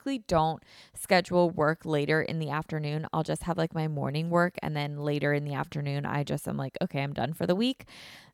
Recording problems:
none

